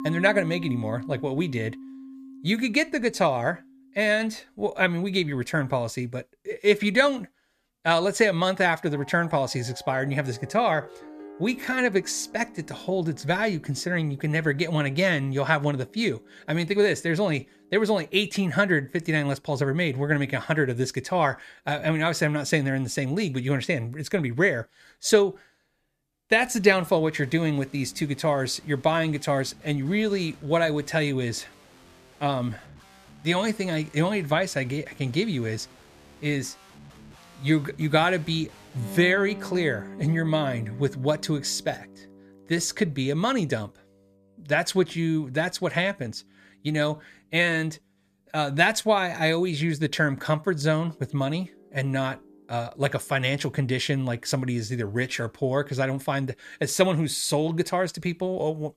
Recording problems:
background music; noticeable; throughout; 20 dB below the speech

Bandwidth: 14.5 kHz